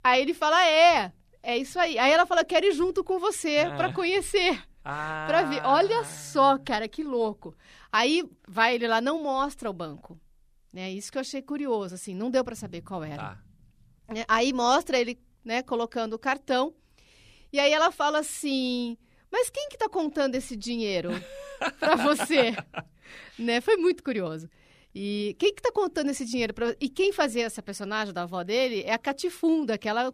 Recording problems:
none

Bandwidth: 14.5 kHz